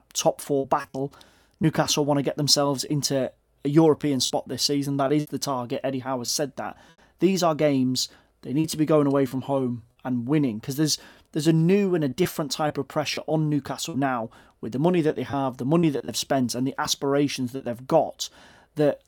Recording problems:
choppy; occasionally; 4% of the speech affected

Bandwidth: 18 kHz